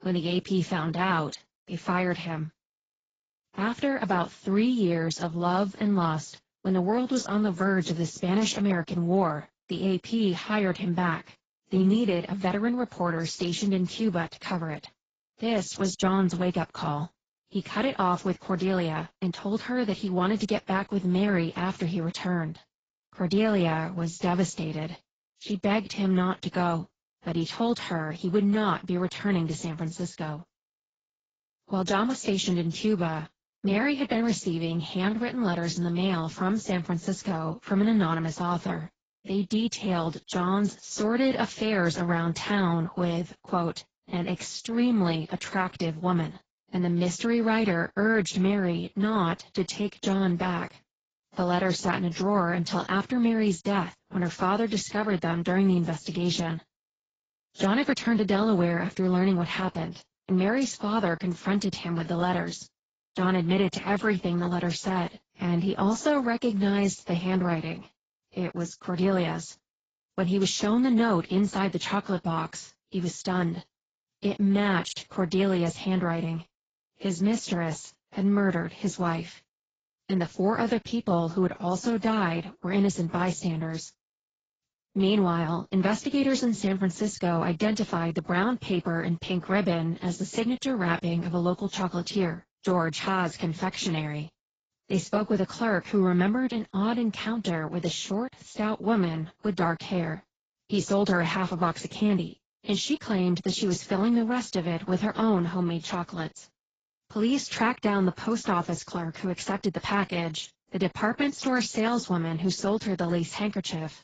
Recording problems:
garbled, watery; badly; nothing above 7.5 kHz

